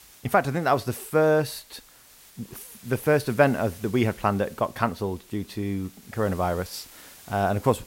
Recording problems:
hiss; faint; throughout; 20 dB below the speech

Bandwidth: 16 kHz